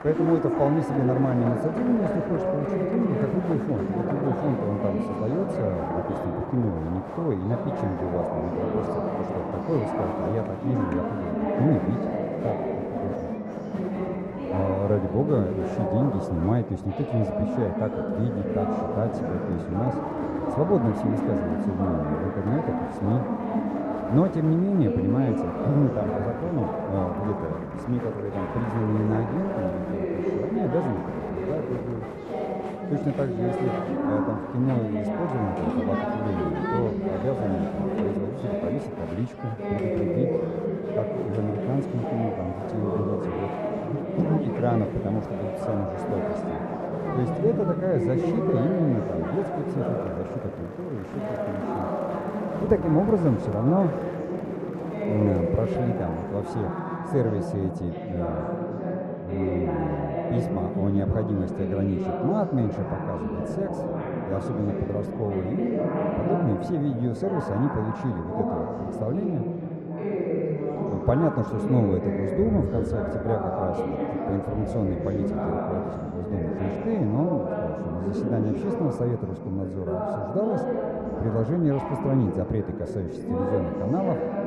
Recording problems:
muffled; very; fading above 1.5 kHz
murmuring crowd; loud; throughout; 1 dB below the speech
train or aircraft noise; noticeable; throughout; 20 dB below the speech

